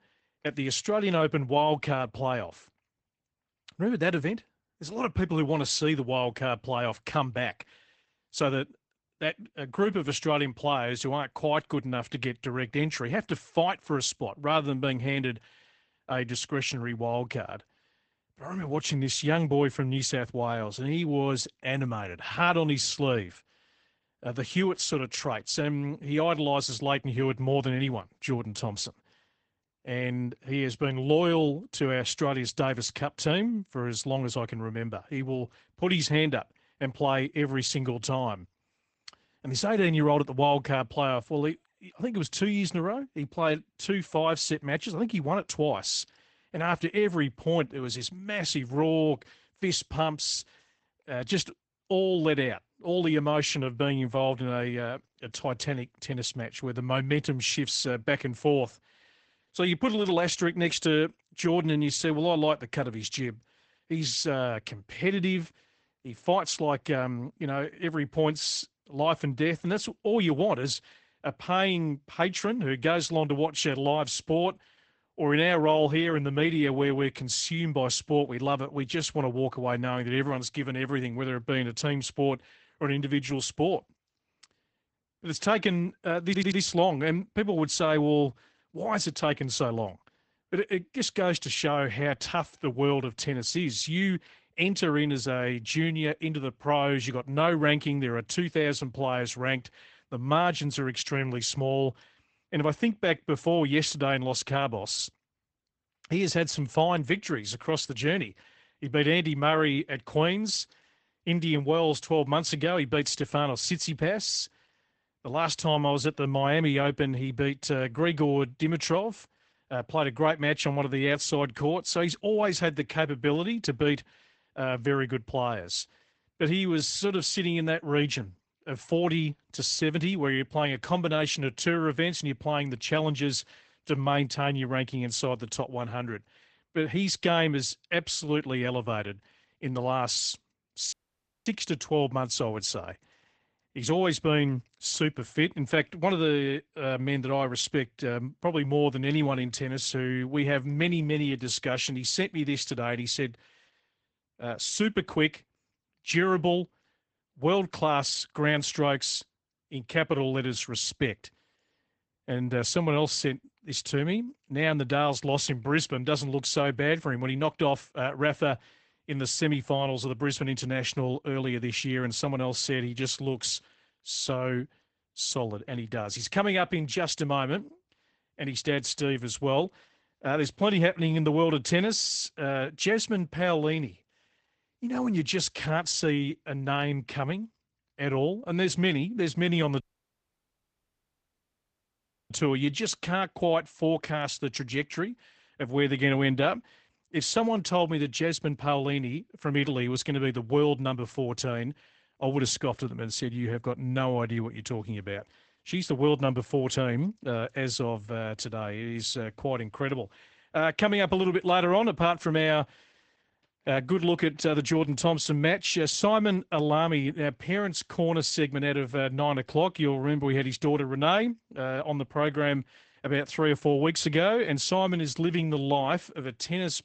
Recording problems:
garbled, watery; badly; nothing above 8 kHz
audio stuttering; at 1:26
audio cutting out; at 2:21 for 0.5 s and at 3:10 for 2.5 s

